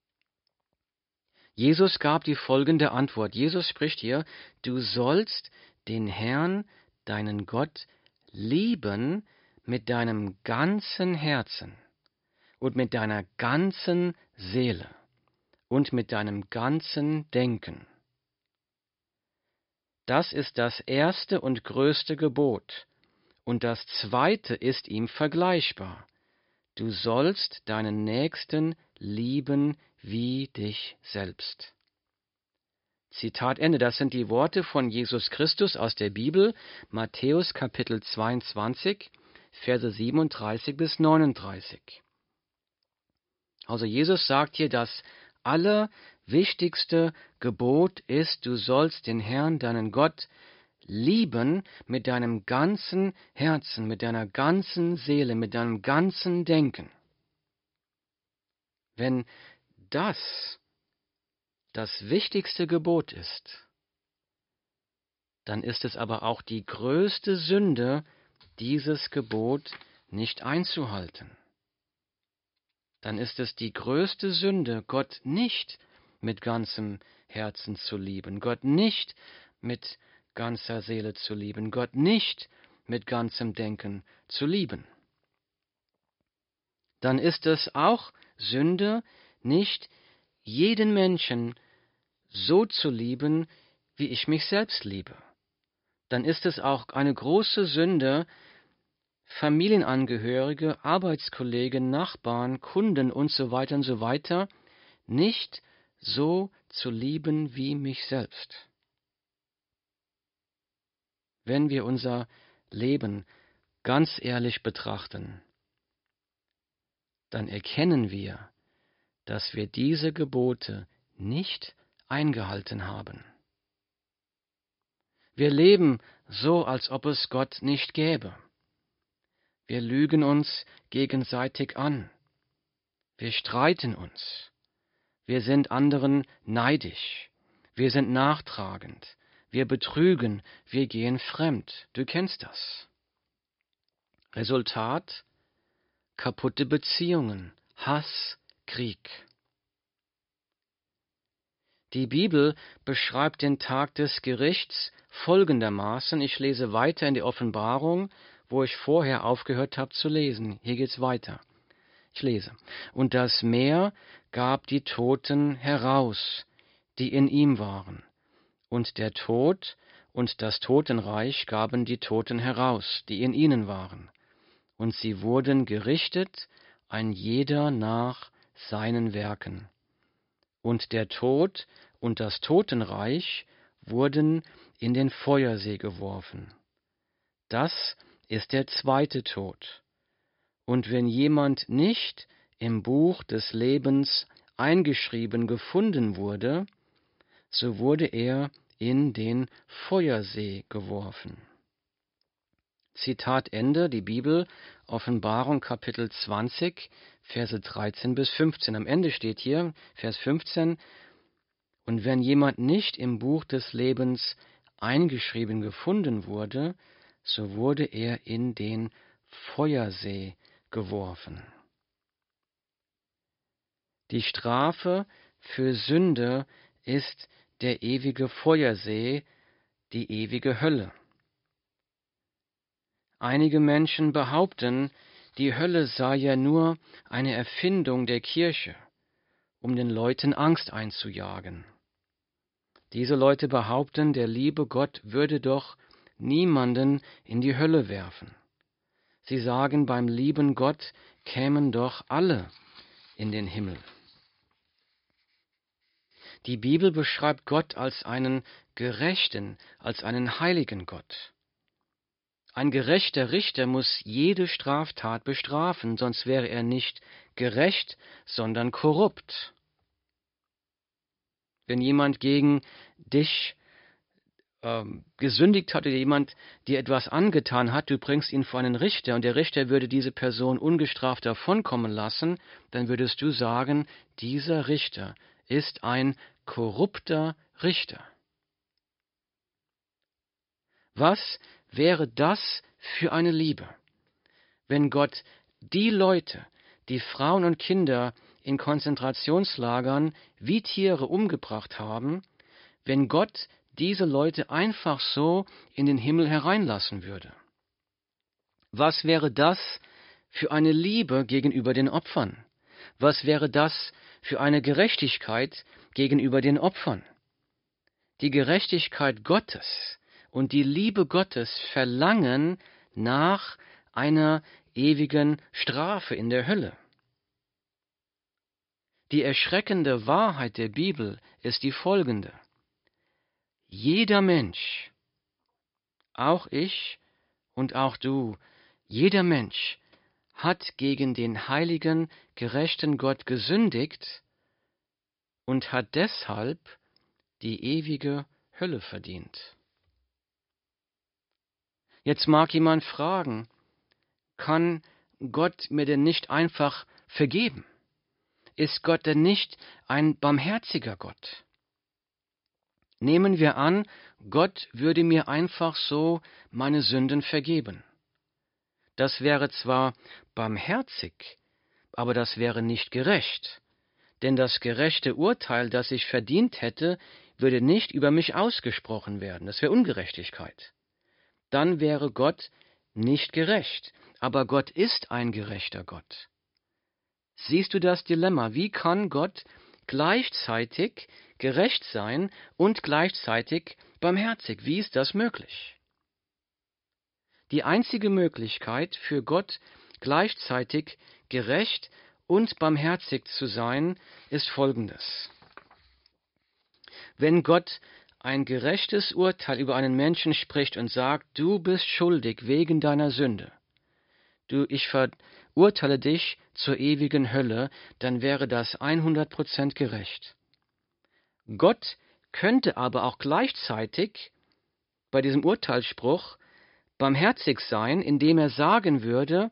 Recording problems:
high frequencies cut off; noticeable; nothing above 5.5 kHz

